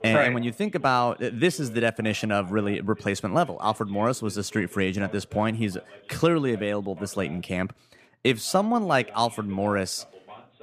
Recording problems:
voice in the background; faint; throughout; 20 dB below the speech

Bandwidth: 15 kHz